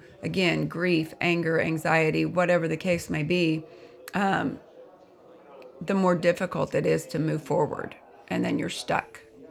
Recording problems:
background chatter; faint; throughout; 4 voices, 25 dB below the speech

